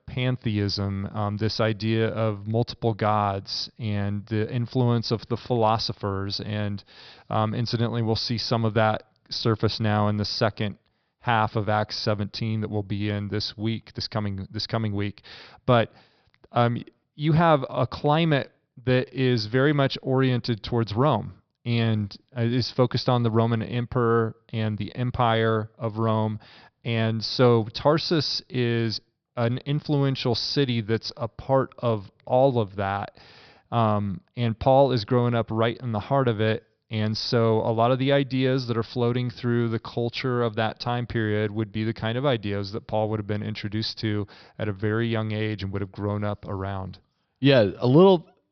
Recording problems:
high frequencies cut off; noticeable; nothing above 5.5 kHz

